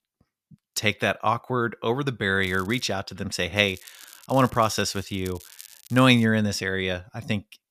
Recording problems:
crackling; faint; at 2.5 s and from 3.5 to 6.5 s; 20 dB below the speech

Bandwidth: 14.5 kHz